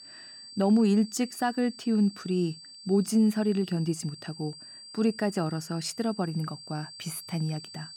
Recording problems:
high-pitched whine; noticeable; throughout; 4.5 kHz, 15 dB below the speech

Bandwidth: 17 kHz